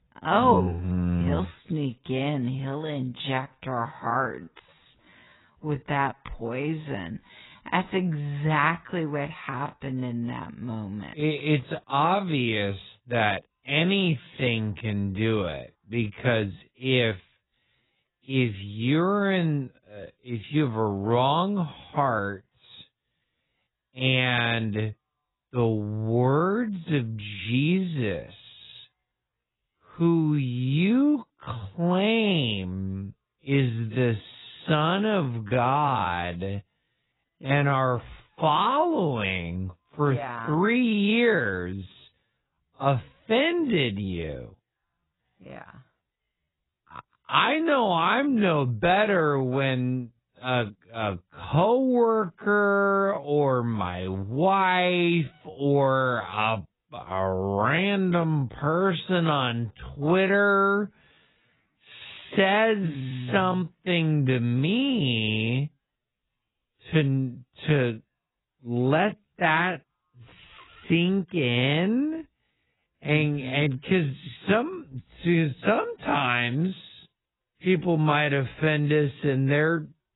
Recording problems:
garbled, watery; badly; nothing above 4 kHz
wrong speed, natural pitch; too slow; 0.5 times normal speed

